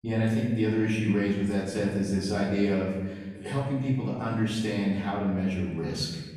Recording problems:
off-mic speech; far
room echo; noticeable; dies away in 1.1 s

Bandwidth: 14 kHz